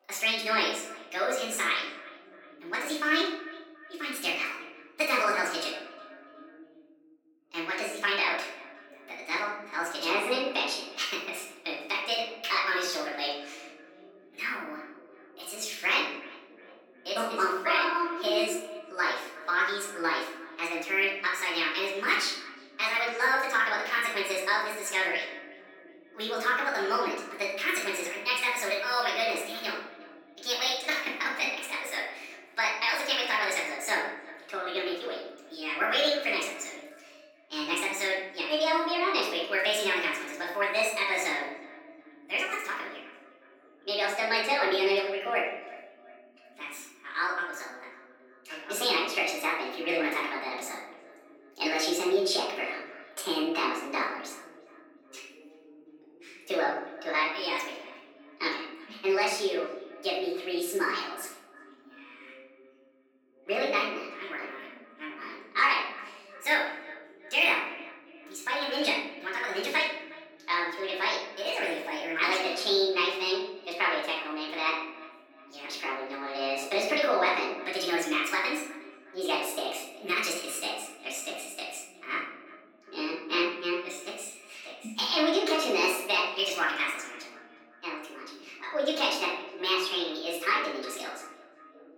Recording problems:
off-mic speech; far
wrong speed and pitch; too fast and too high; 1.5 times normal speed
room echo; noticeable; dies away in 0.7 s
thin; somewhat; fading below 300 Hz
echo of what is said; faint; throughout; 360 ms later, 20 dB below the speech
voice in the background; faint; throughout; 30 dB below the speech

